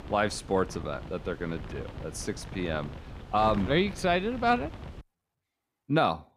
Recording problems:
wind noise on the microphone; occasional gusts; until 5 s; 15 dB below the speech

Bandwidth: 15 kHz